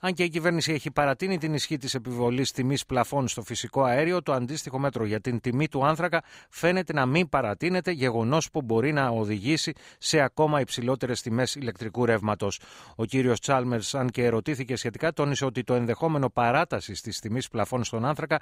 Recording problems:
none

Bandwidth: 15.5 kHz